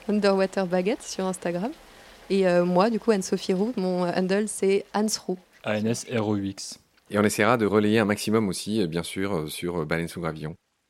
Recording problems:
rain or running water; faint; throughout; 25 dB below the speech

